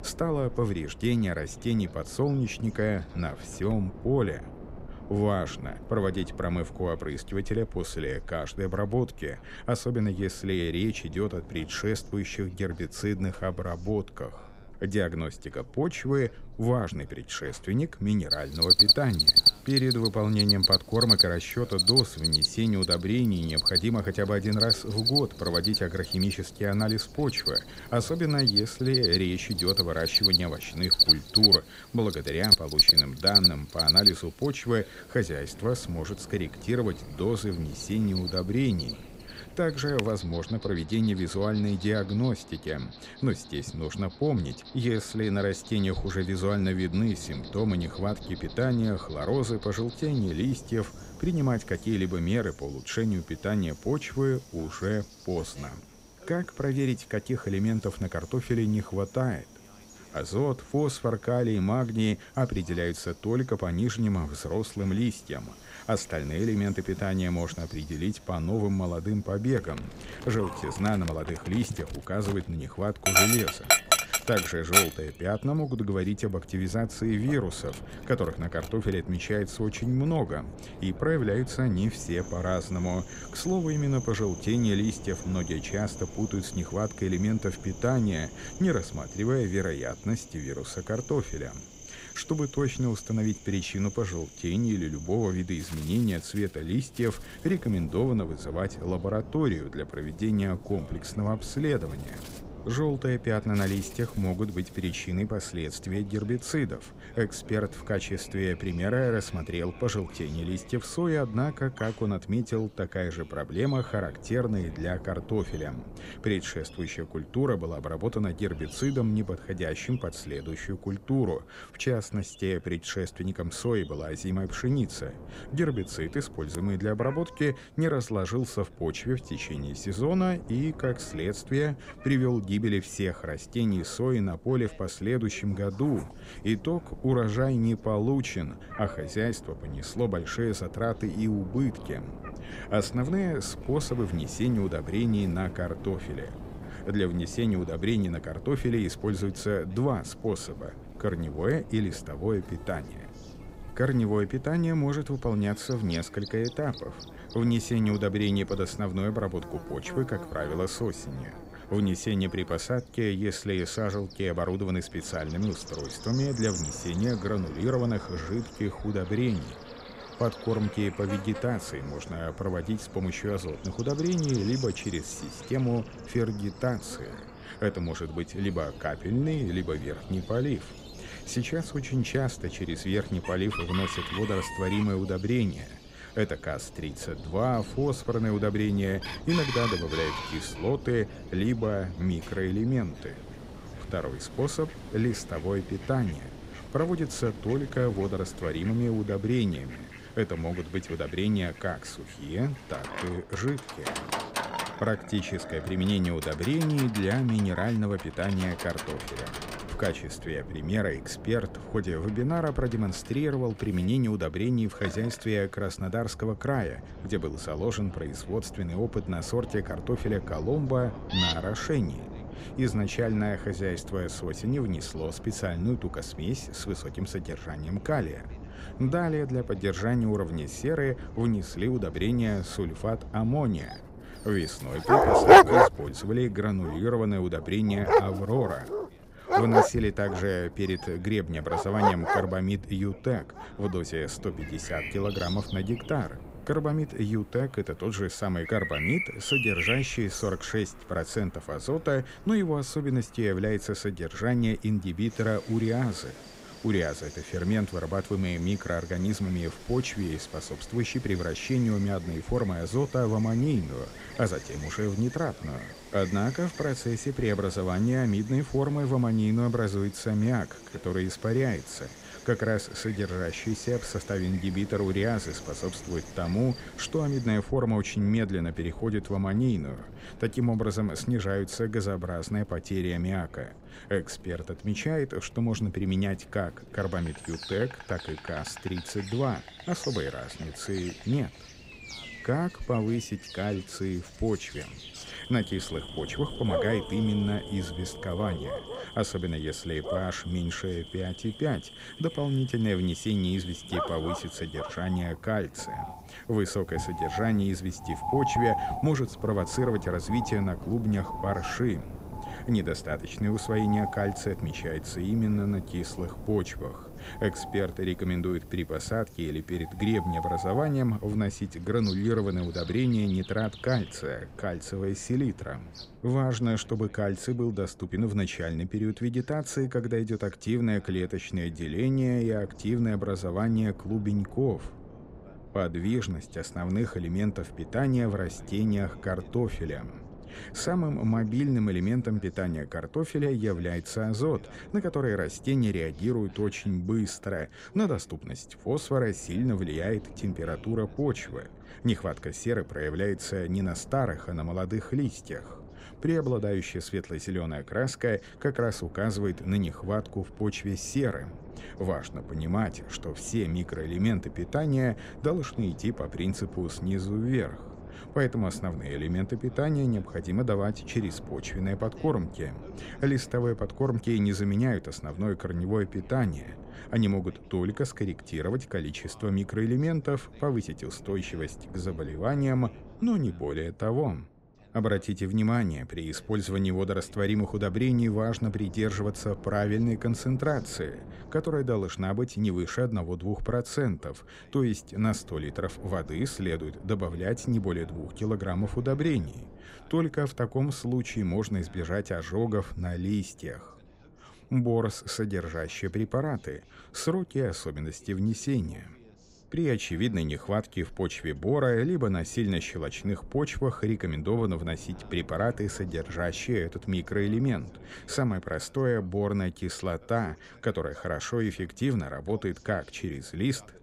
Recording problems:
animal sounds; very loud; until 5:26; 3 dB above the speech
wind noise on the microphone; occasional gusts; 20 dB below the speech
voice in the background; faint; throughout; 30 dB below the speech

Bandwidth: 15.5 kHz